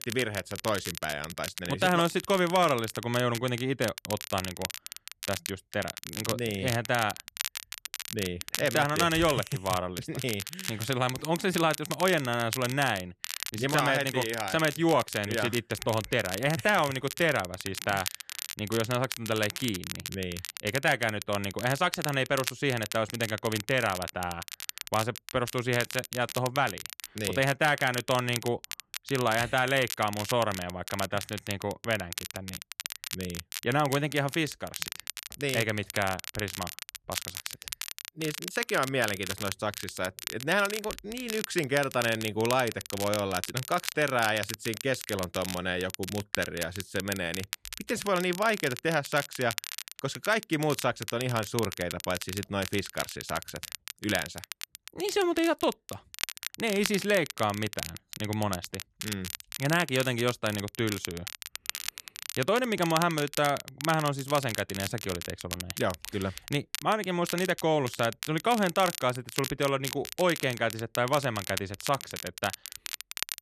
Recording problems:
crackle, like an old record; loud; 8 dB below the speech

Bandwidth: 14 kHz